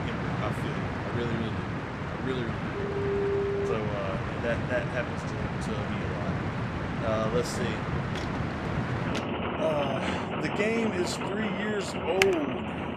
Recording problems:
rain or running water; very loud; throughout; 1 dB above the speech
phone ringing; loud; from 2.5 to 3.5 s; peak 4 dB above the speech
footsteps; noticeable; from 8 to 9 s; peak 9 dB below the speech
keyboard typing; very faint; at 12 s; peak 4 dB above the speech

